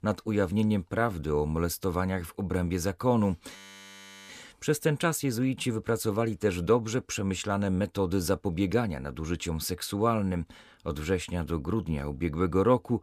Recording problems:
audio freezing; at 3.5 s for 0.5 s

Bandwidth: 14.5 kHz